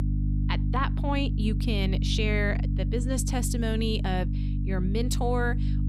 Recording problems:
electrical hum; loud; throughout; 50 Hz, 9 dB below the speech

